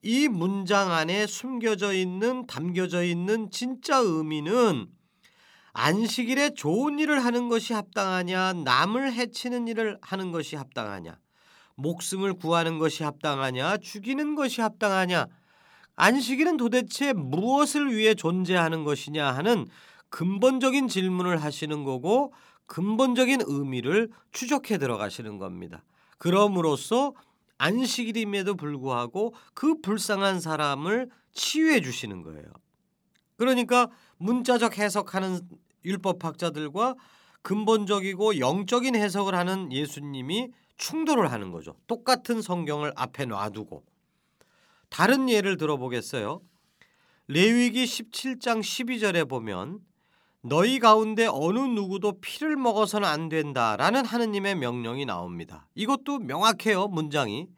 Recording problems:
none

